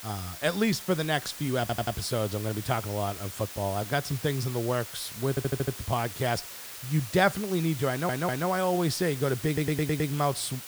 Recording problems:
hiss; noticeable; throughout; 10 dB below the speech
audio stuttering; 4 times, first at 1.5 s

